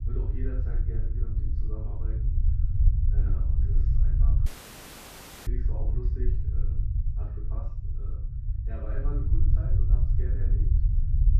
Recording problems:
off-mic speech; far
muffled; very; fading above 2 kHz
room echo; noticeable; dies away in 0.4 s
low rumble; very loud; throughout; 1 dB above the speech
audio cutting out; filled with static; at 4.5 s for 1 s

